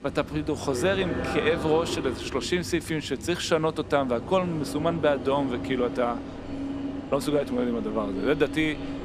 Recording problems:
train or aircraft noise; loud; throughout; 8 dB below the speech

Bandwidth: 14.5 kHz